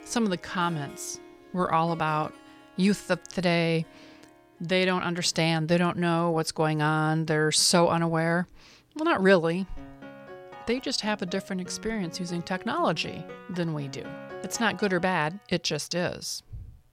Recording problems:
background music; noticeable; throughout; 20 dB below the speech

